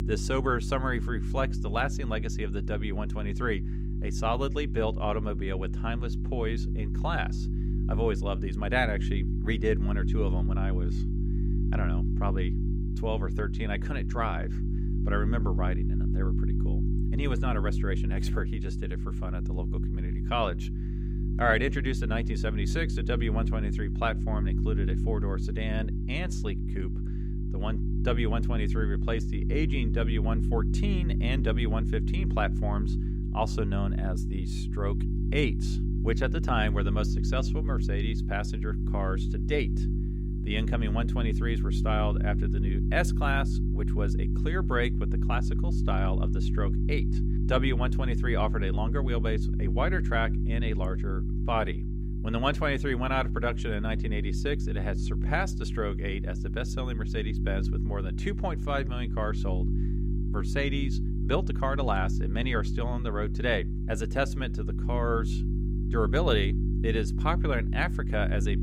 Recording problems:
electrical hum; loud; throughout; 50 Hz, 9 dB below the speech

